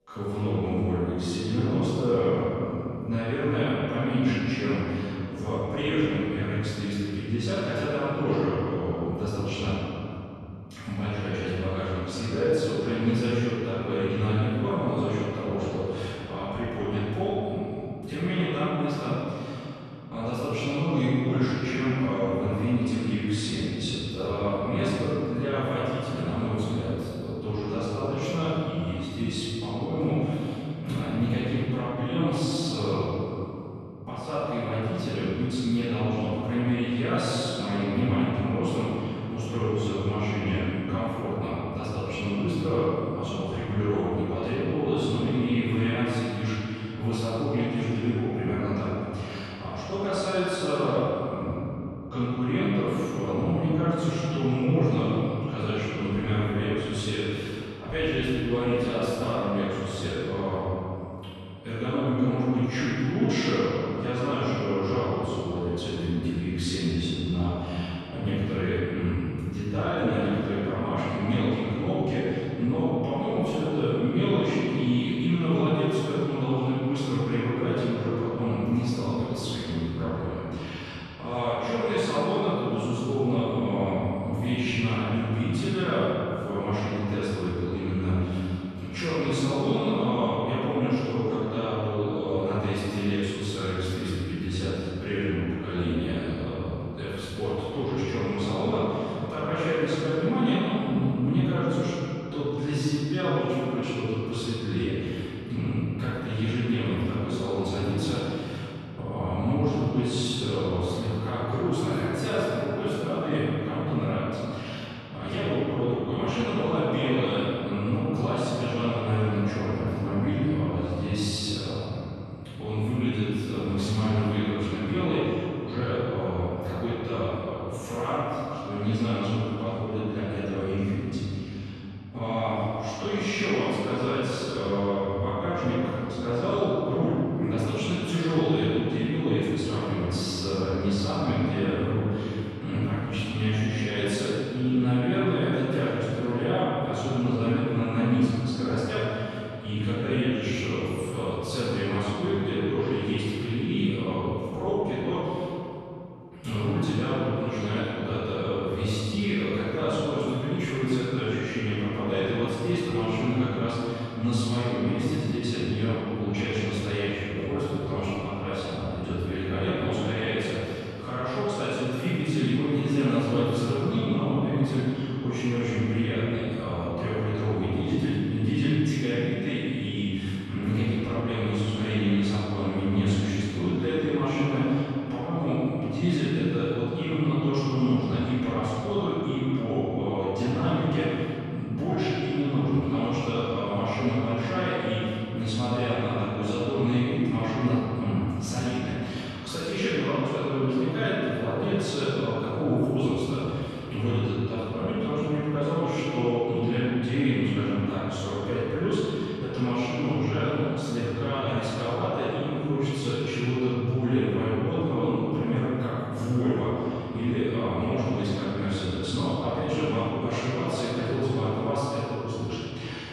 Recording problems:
room echo; strong; dies away in 3 s
off-mic speech; far

